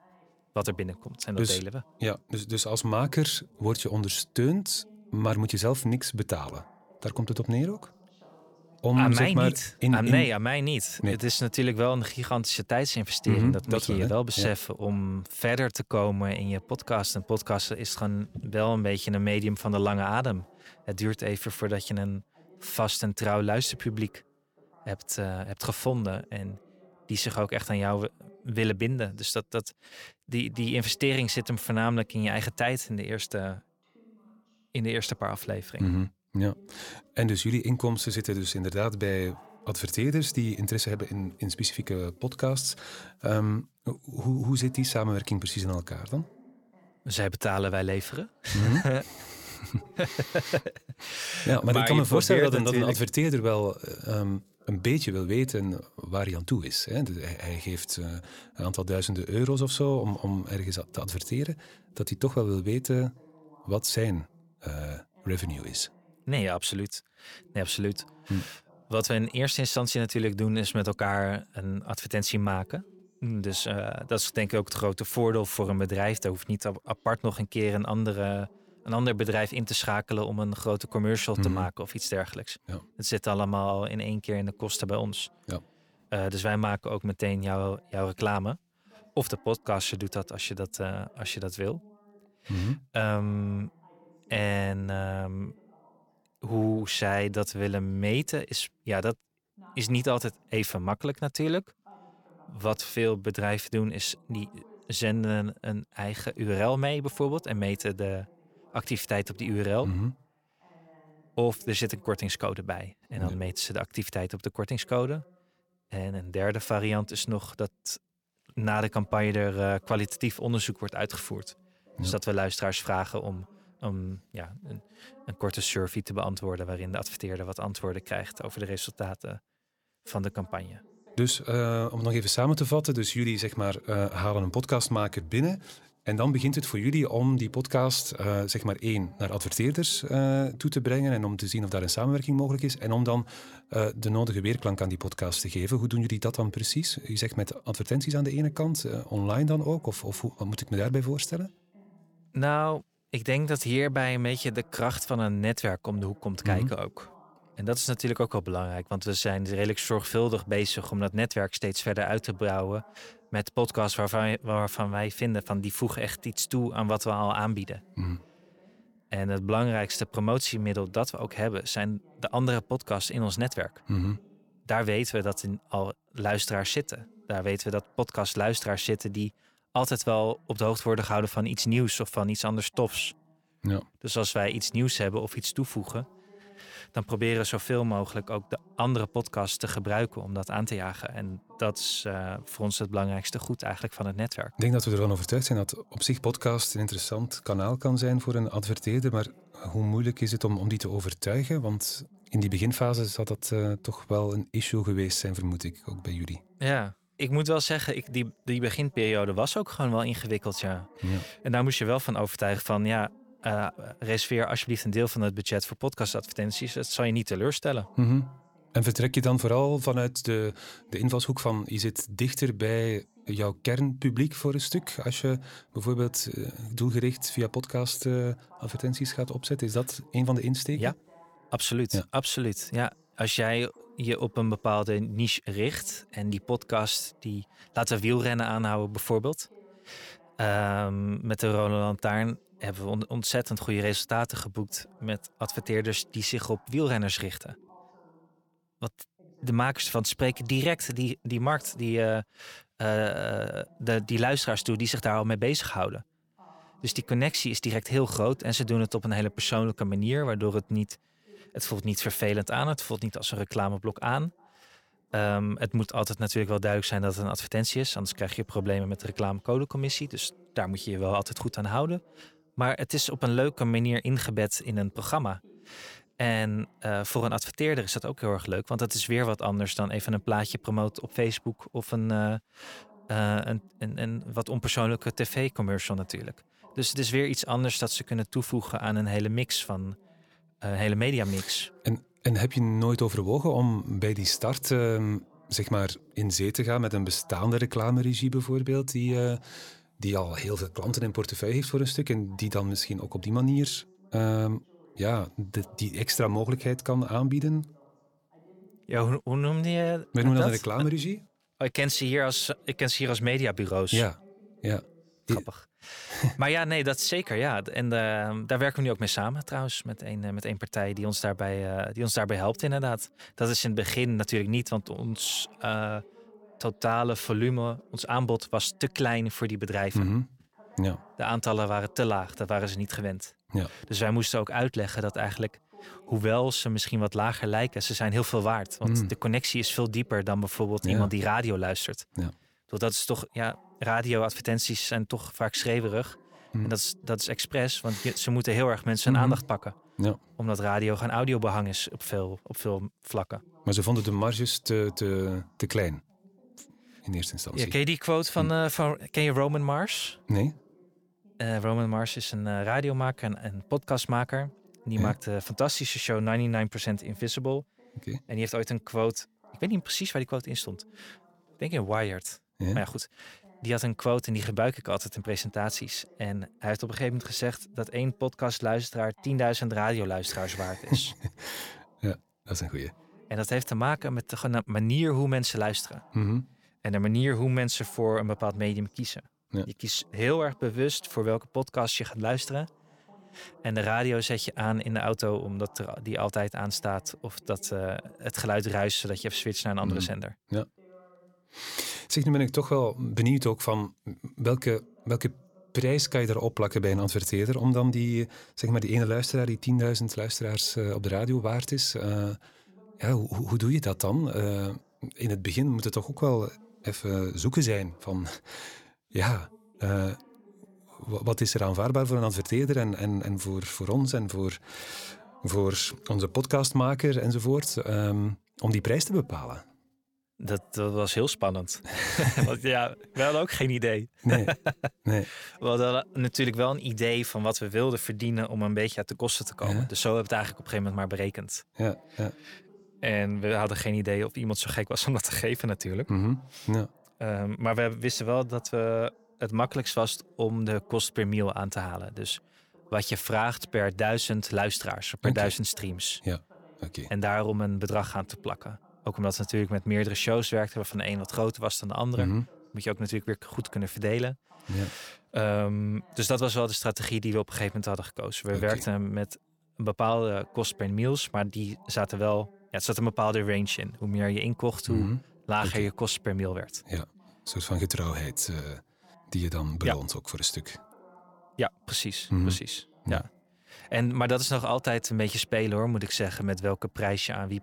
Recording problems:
voice in the background; faint; throughout; 30 dB below the speech

